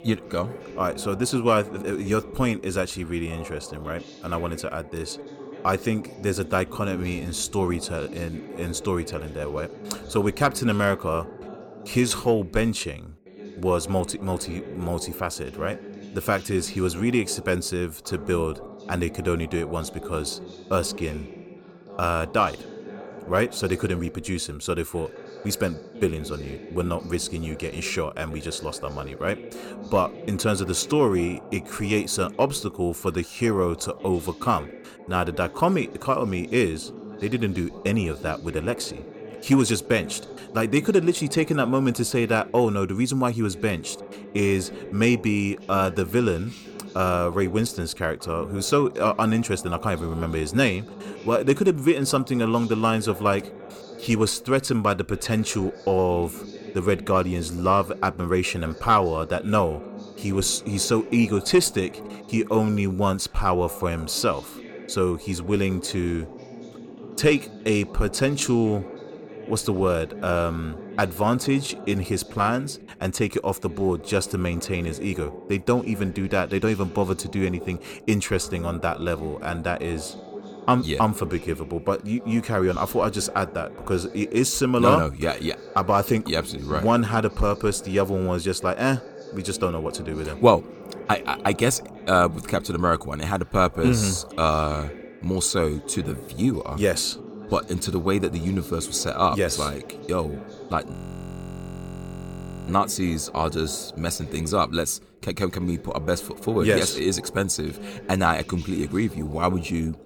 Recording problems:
voice in the background; noticeable; throughout; 15 dB below the speech
audio freezing; at 1:41 for 2 s

